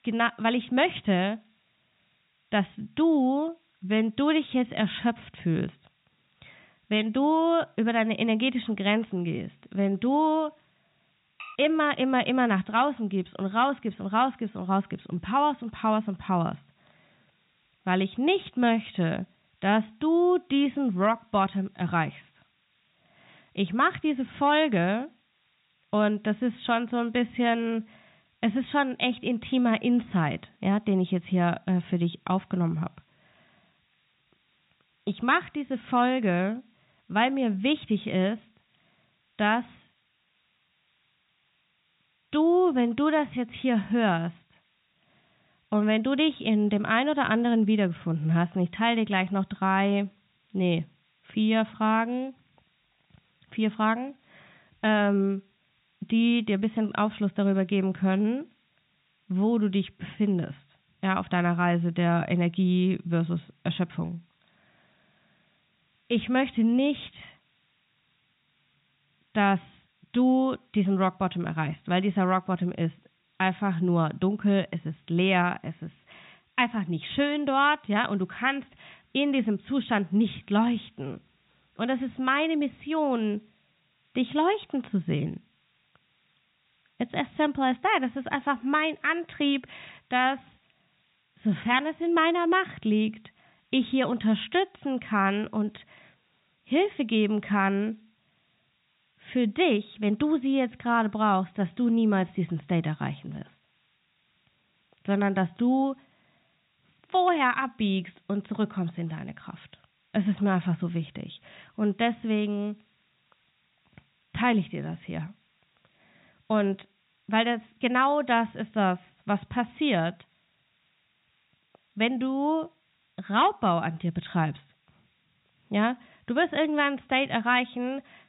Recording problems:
high frequencies cut off; severe; nothing above 4 kHz
hiss; very faint; throughout; 40 dB below the speech
clattering dishes; faint; at 11 s; peak 15 dB below the speech

